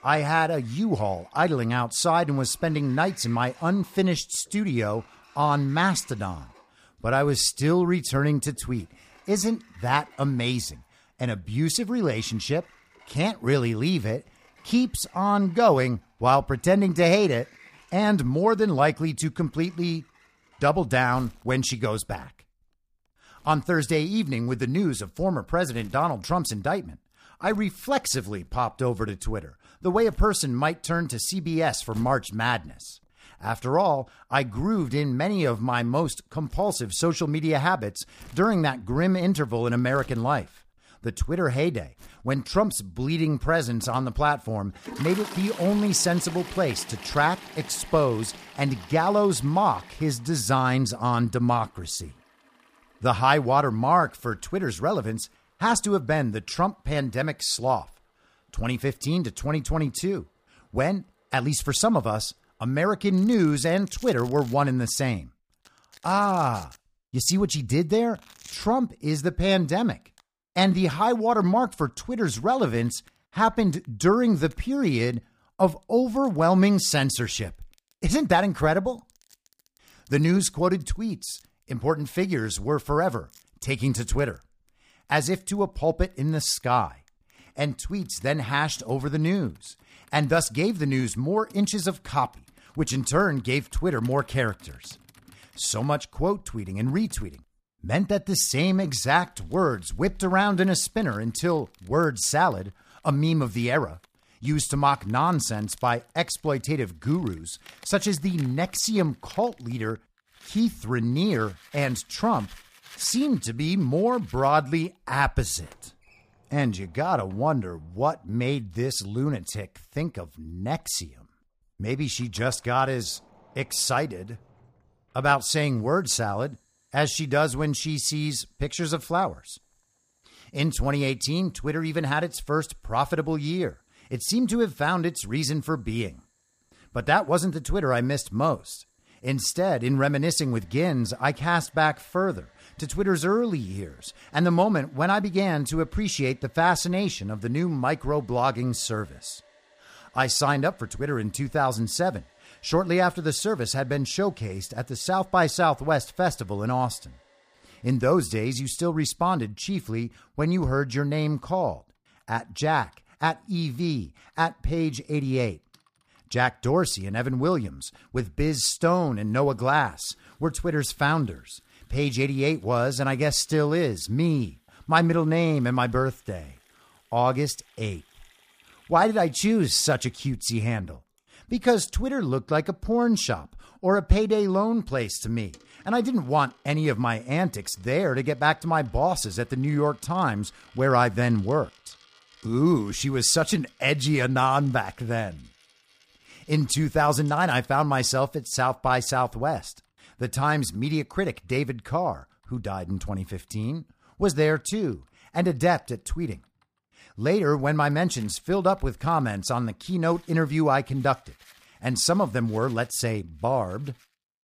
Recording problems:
household noises; faint; throughout; 25 dB below the speech

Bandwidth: 15 kHz